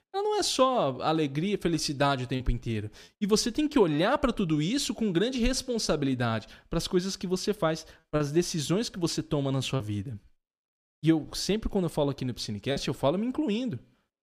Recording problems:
choppy; occasionally; at 2.5 s, from 8 to 10 s and at 13 s; 2% of the speech affected

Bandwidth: 15 kHz